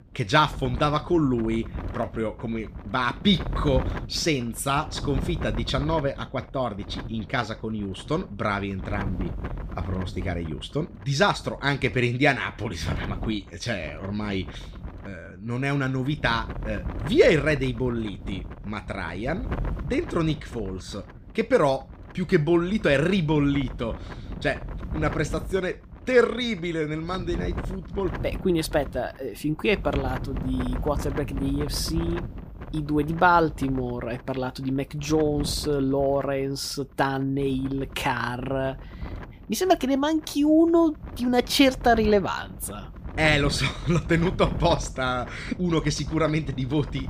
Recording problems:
wind noise on the microphone; occasional gusts; 15 dB below the speech

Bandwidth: 15 kHz